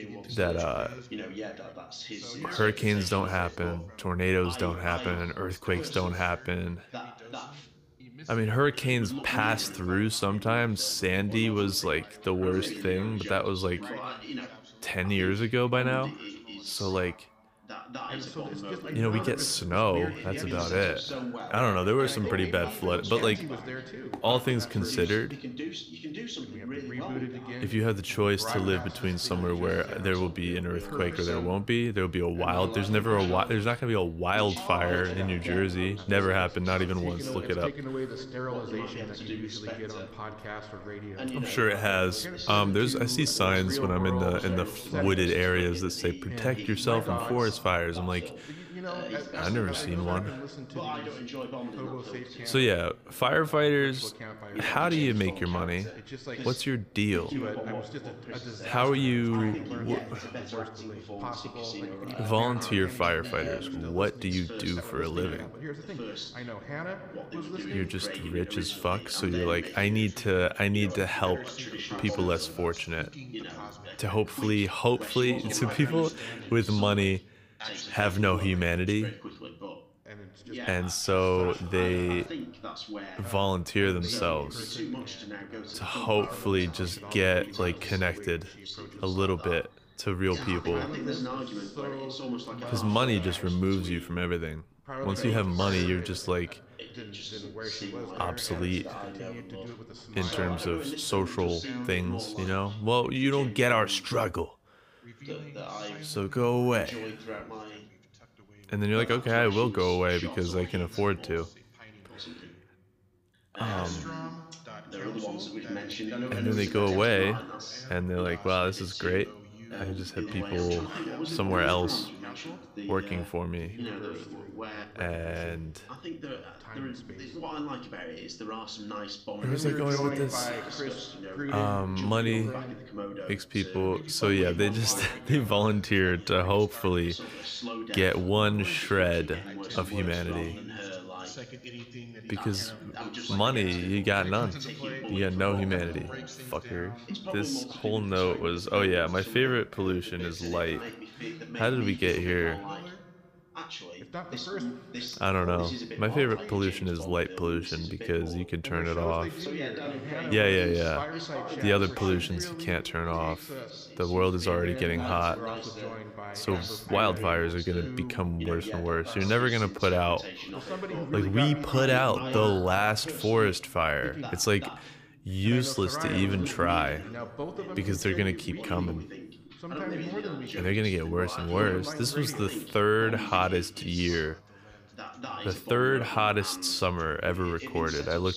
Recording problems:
background chatter; loud; throughout; 2 voices, 10 dB below the speech

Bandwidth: 15 kHz